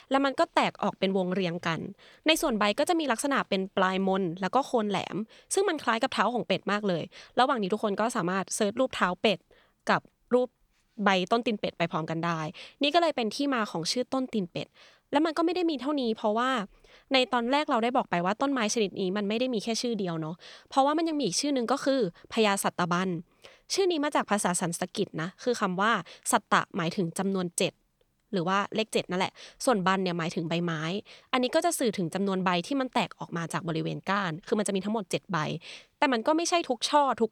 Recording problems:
none

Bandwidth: 18.5 kHz